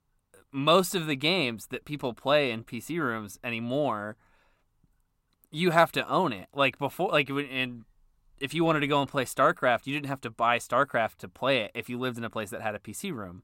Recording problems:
none

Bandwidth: 16 kHz